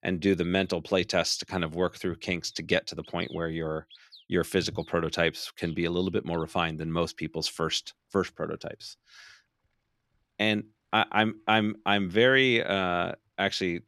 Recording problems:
animal sounds; faint; throughout; 25 dB below the speech

